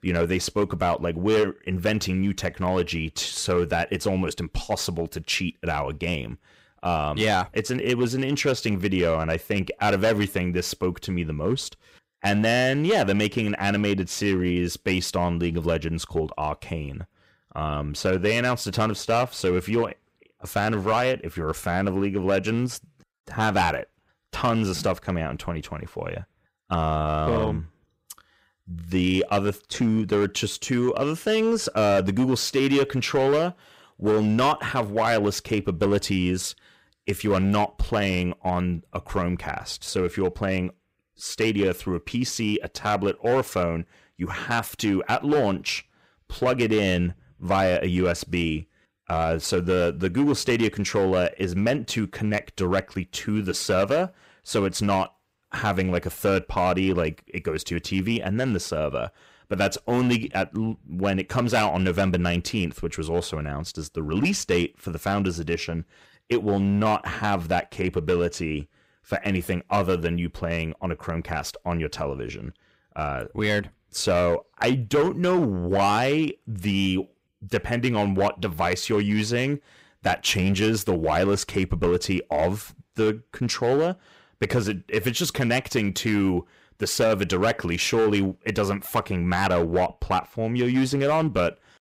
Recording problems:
distortion; slight; 5% of the sound clipped

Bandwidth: 15.5 kHz